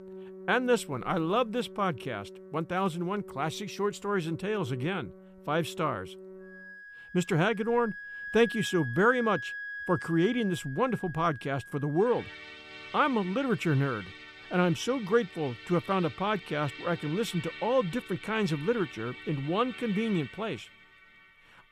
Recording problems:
background music; noticeable; throughout; 15 dB below the speech

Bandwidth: 15 kHz